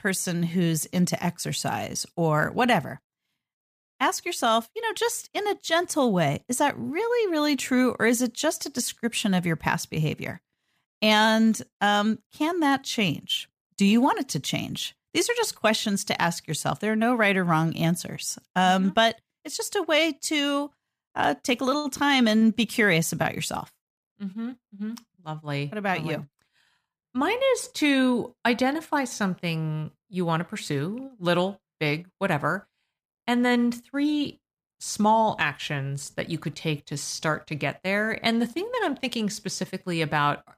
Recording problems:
none

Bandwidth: 15 kHz